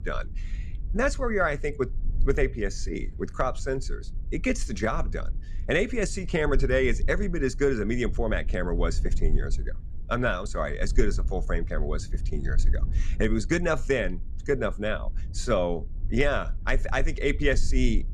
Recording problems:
low rumble; faint; throughout; 25 dB below the speech

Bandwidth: 14 kHz